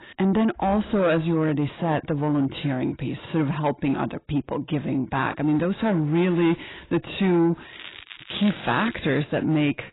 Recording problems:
garbled, watery; badly; nothing above 4 kHz
distortion; slight; 10 dB below the speech
crackling; noticeable; from 7.5 to 9 s; 15 dB below the speech

